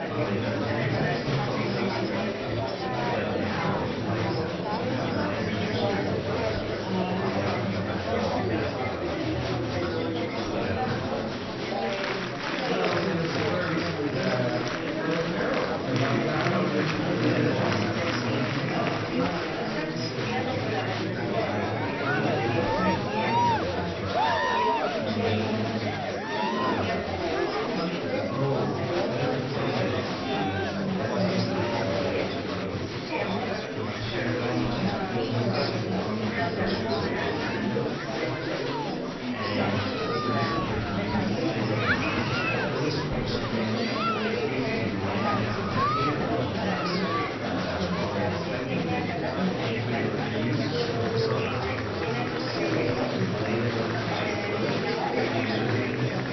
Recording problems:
off-mic speech; far
room echo; noticeable; dies away in 1 s
high frequencies cut off; noticeable; nothing above 6 kHz
murmuring crowd; very loud; throughout; 4 dB above the speech
background music; noticeable; throughout; 15 dB below the speech

